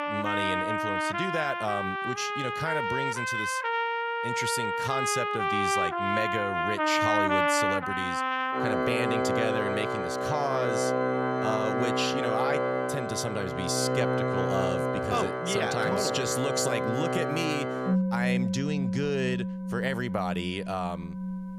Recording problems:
background music; very loud; throughout; 3 dB above the speech

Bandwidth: 14.5 kHz